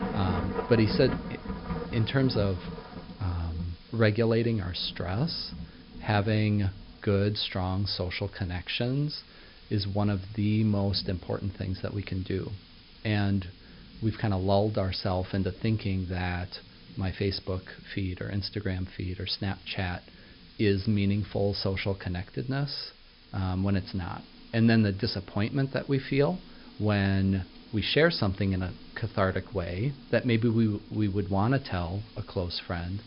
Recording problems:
high frequencies cut off; noticeable; nothing above 5.5 kHz
rain or running water; noticeable; throughout; 15 dB below the speech
hiss; faint; throughout; 25 dB below the speech

